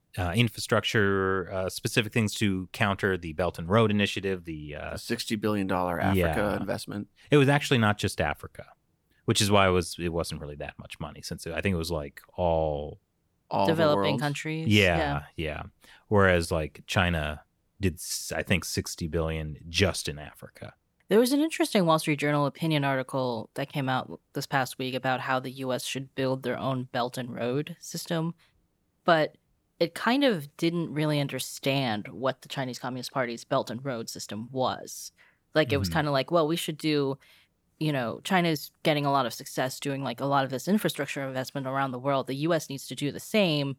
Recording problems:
none

